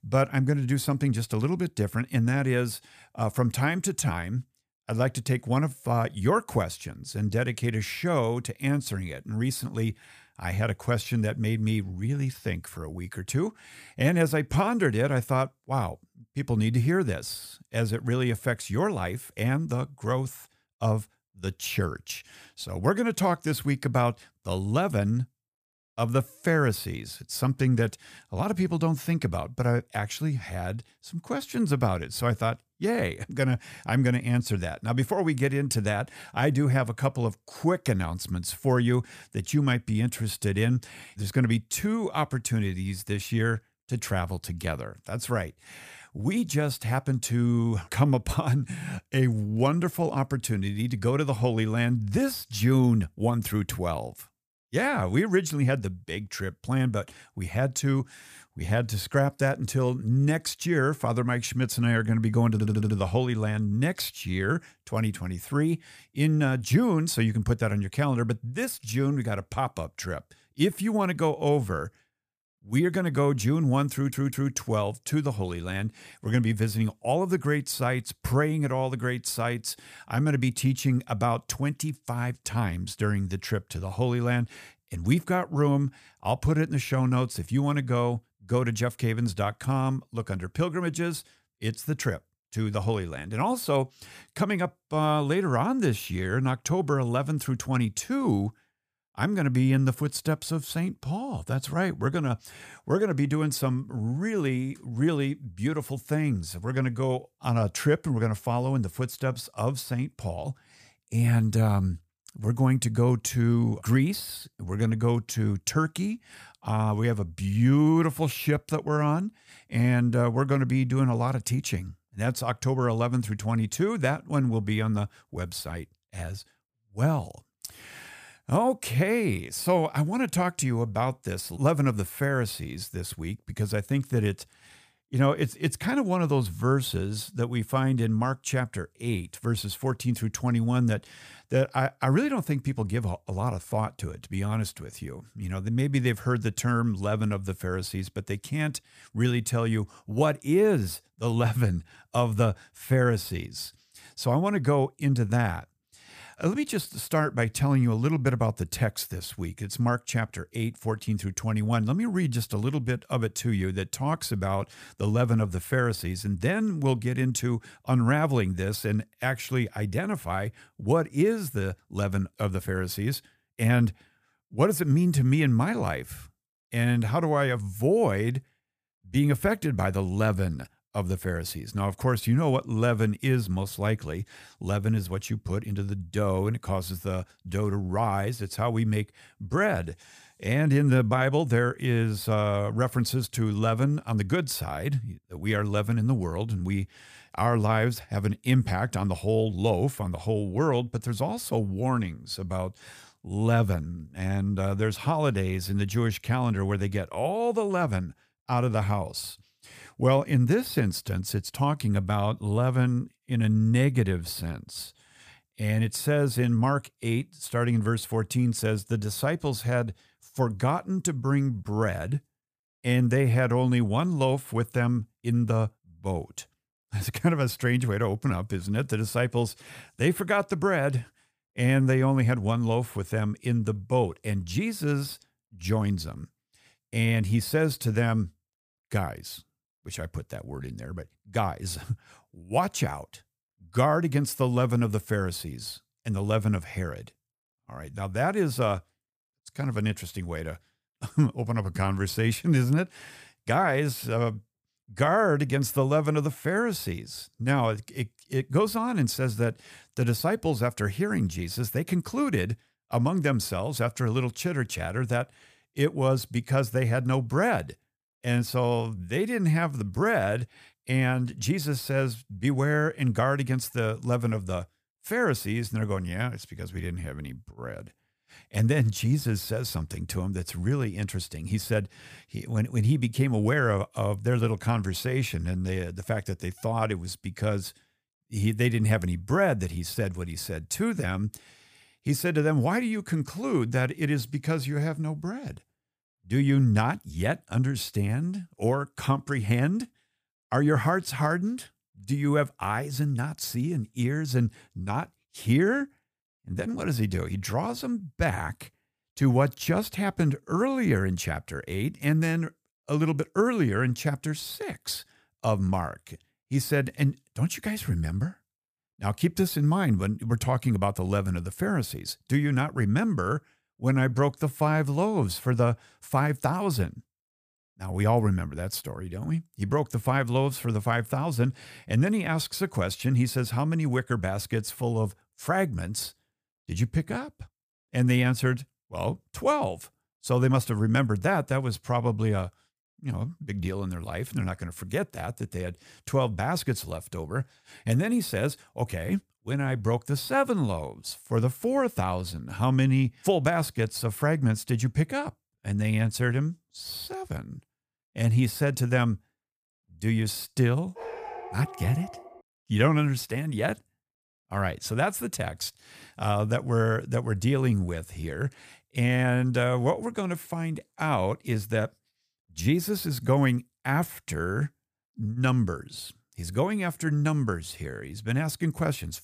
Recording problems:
audio stuttering; at 1:03 and at 1:14
dog barking; faint; from 6:01 to 6:02; peak 10 dB below the speech

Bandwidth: 15 kHz